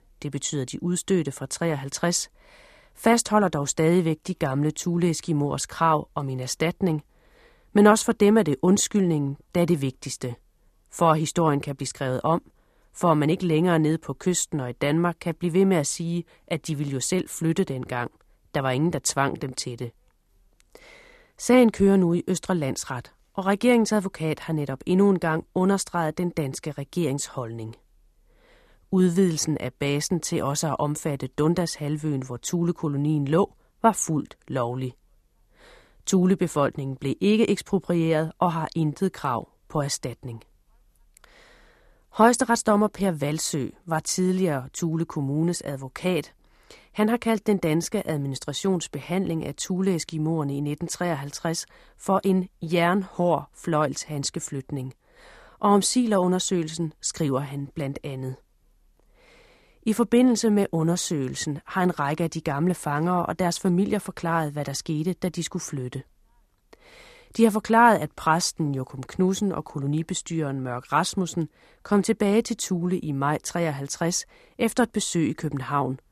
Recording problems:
none

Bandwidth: 14 kHz